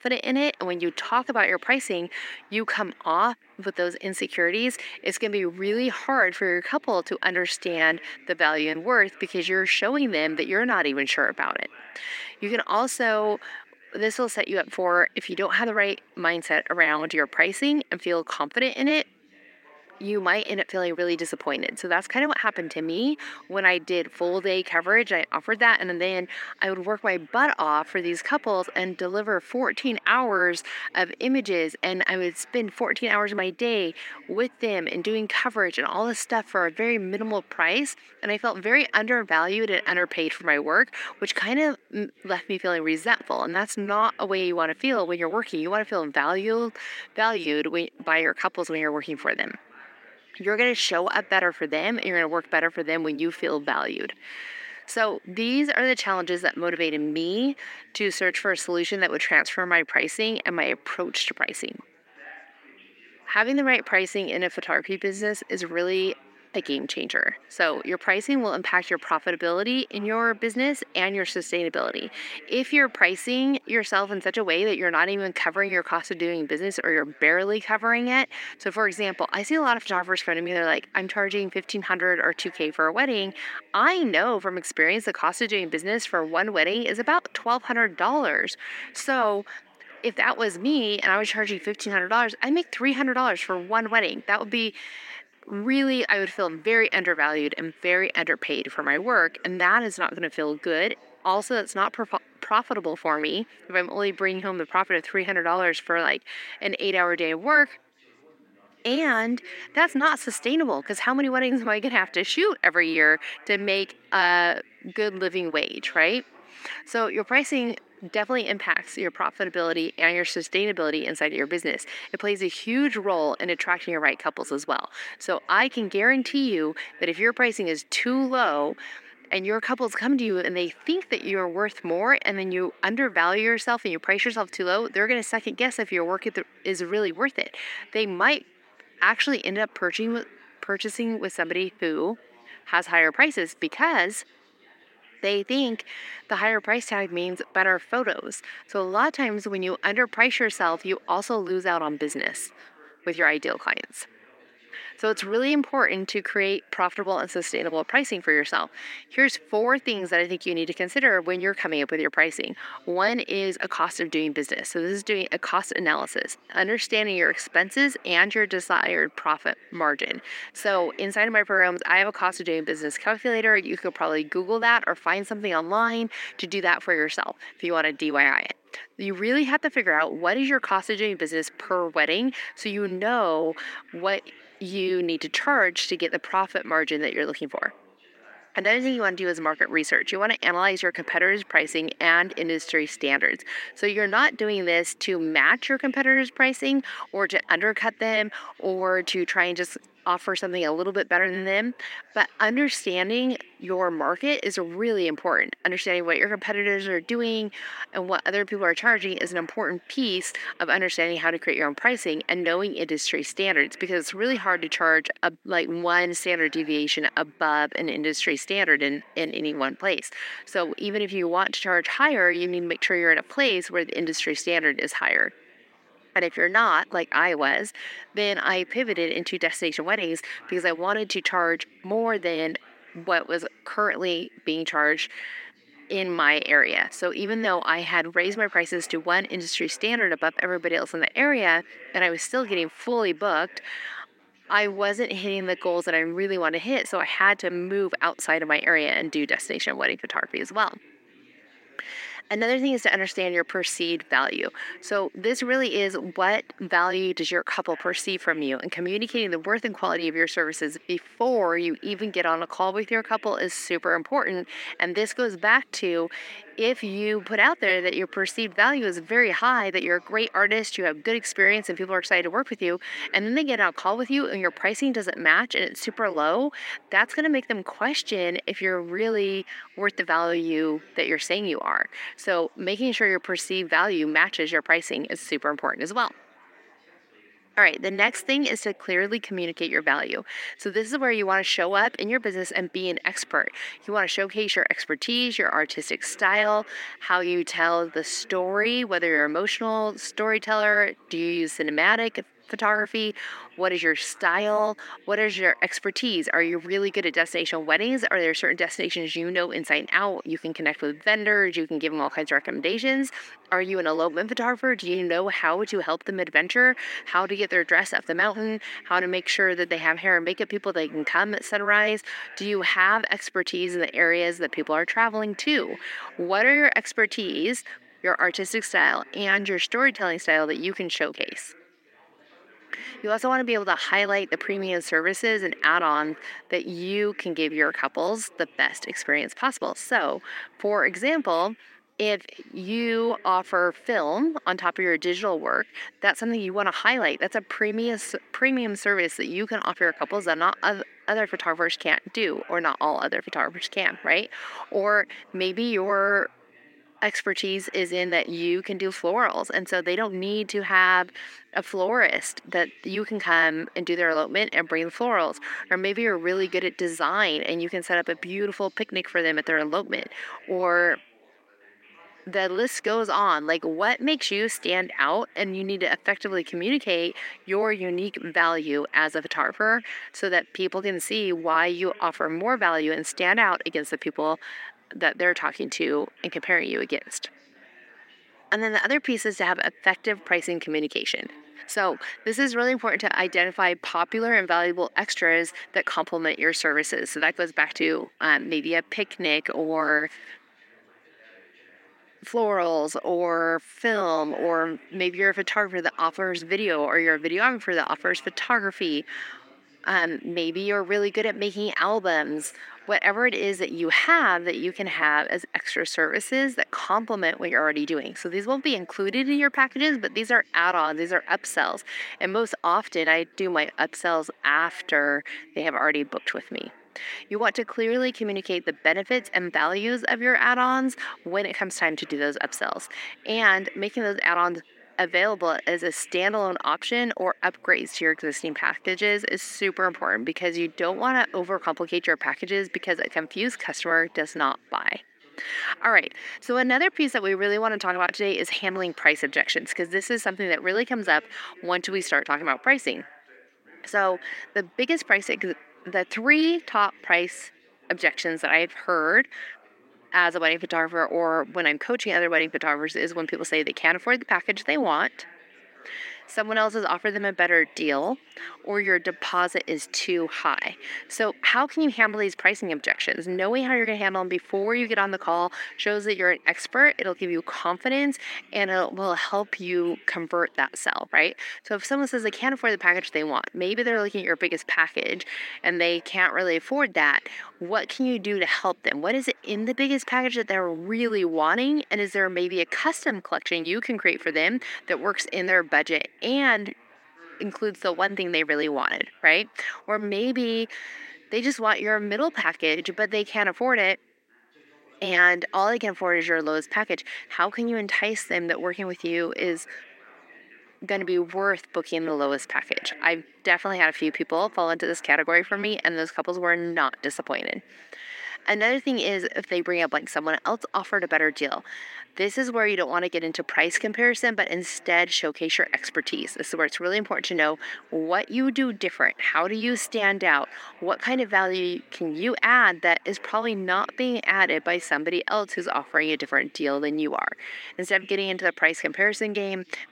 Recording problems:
thin; somewhat; fading below 250 Hz
background chatter; faint; throughout; 4 voices, 30 dB below the speech

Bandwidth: 16 kHz